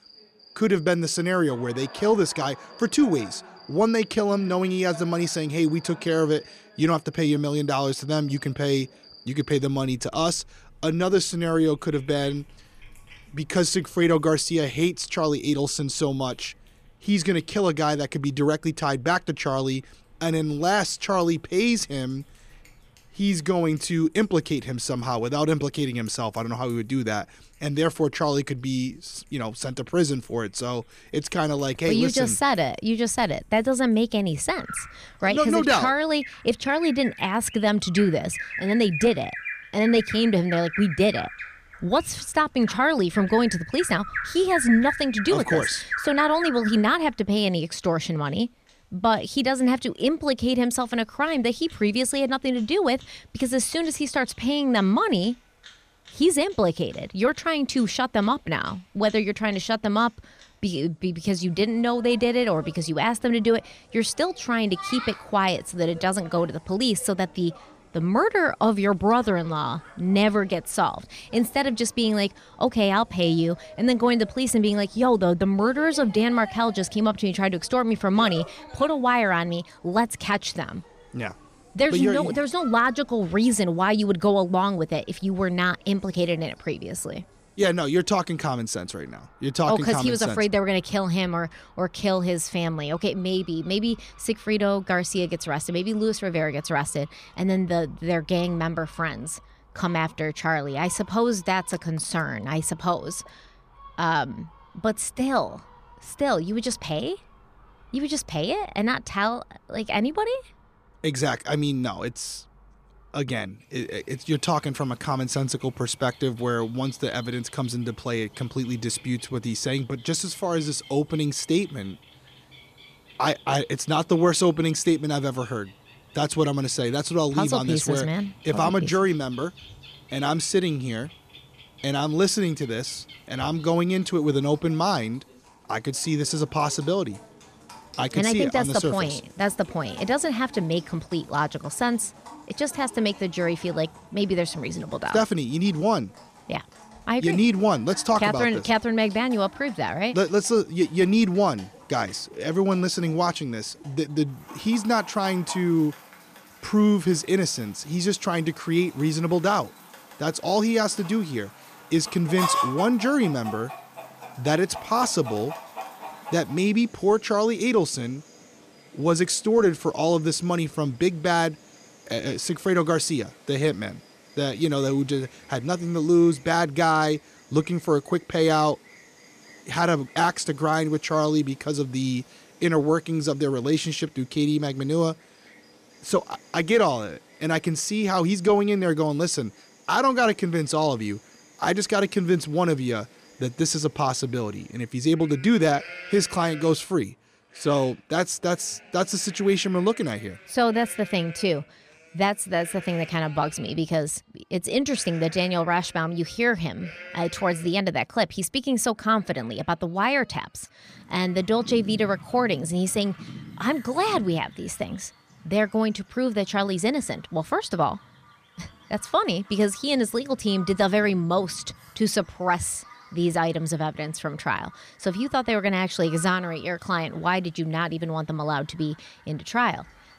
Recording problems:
animal sounds; noticeable; throughout; 15 dB below the speech

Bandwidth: 14.5 kHz